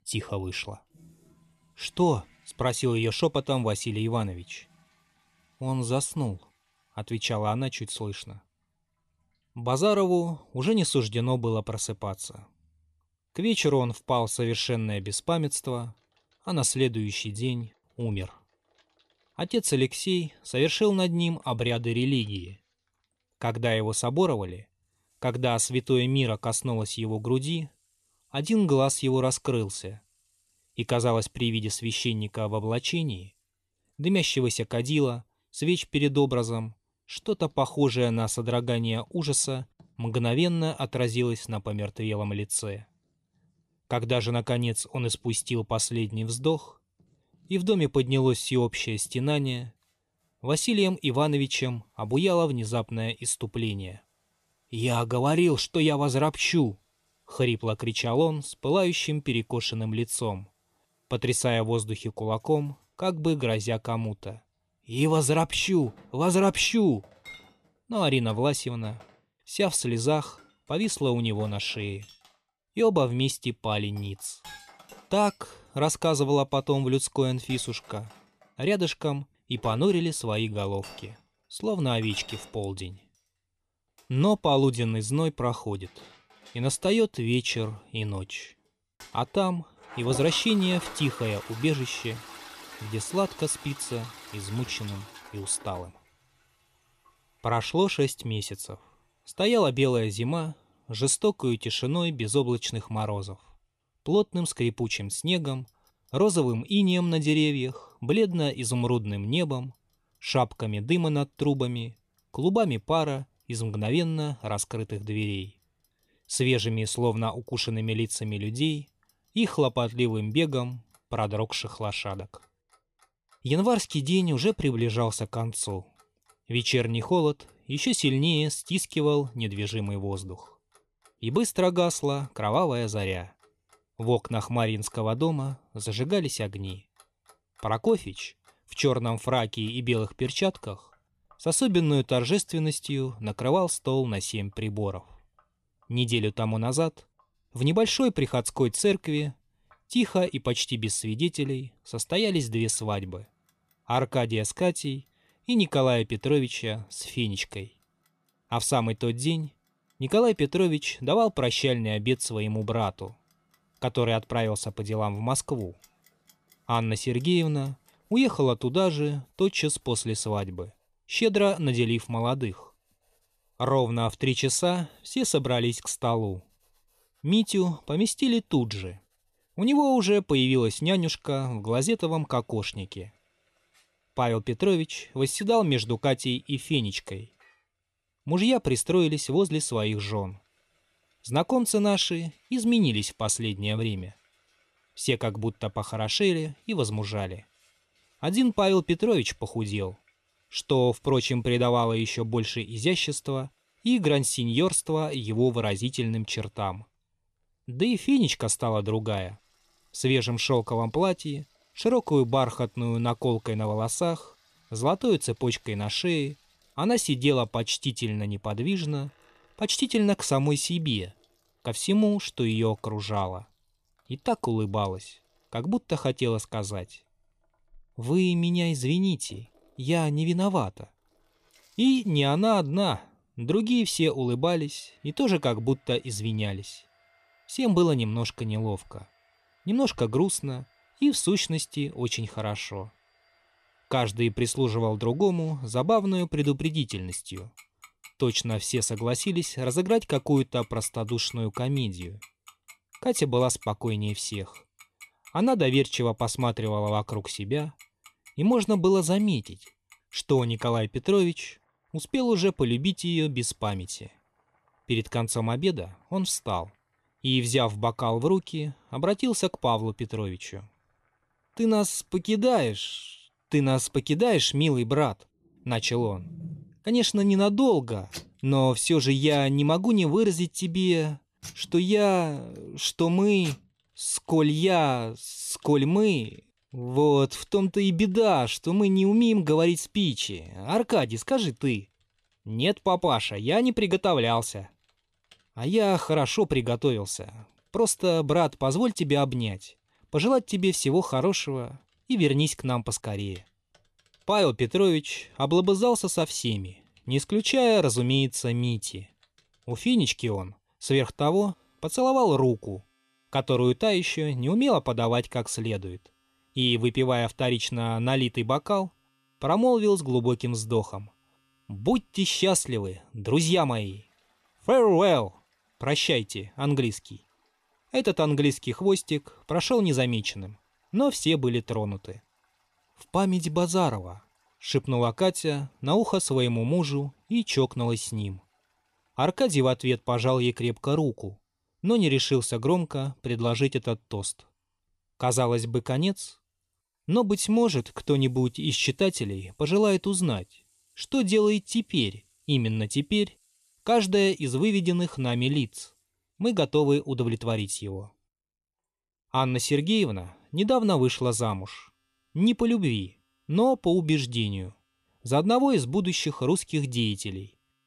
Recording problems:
household noises; faint; throughout; 25 dB below the speech

